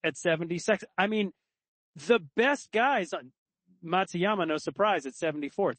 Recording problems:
garbled, watery; slightly; nothing above 8 kHz

